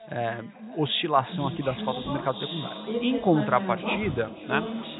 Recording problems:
high frequencies cut off; severe; nothing above 4 kHz
echo of what is said; noticeable; throughout; 480 ms later, 10 dB below the speech
background chatter; loud; throughout; 3 voices, 7 dB below the speech

